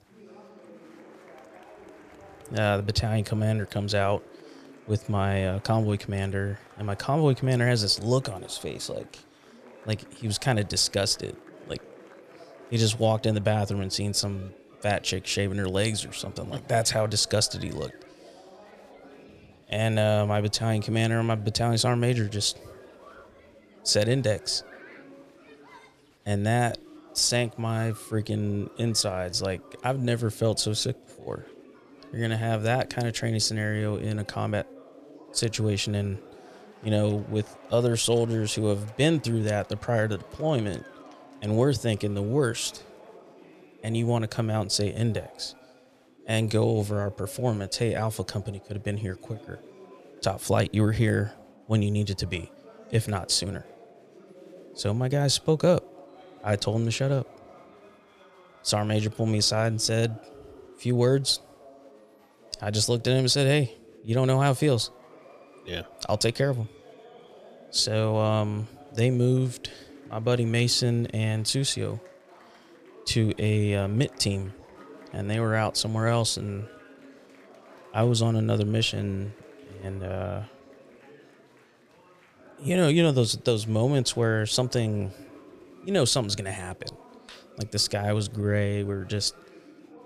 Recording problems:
chatter from many people; faint; throughout; 25 dB below the speech

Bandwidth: 14.5 kHz